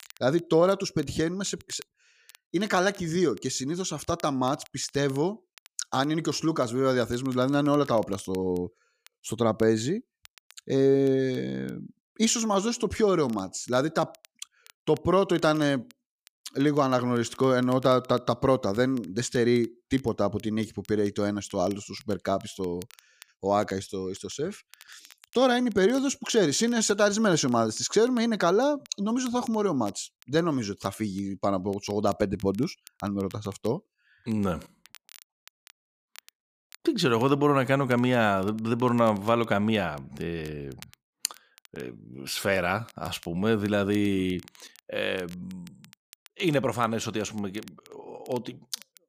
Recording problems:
crackle, like an old record; faint; 25 dB below the speech

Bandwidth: 15 kHz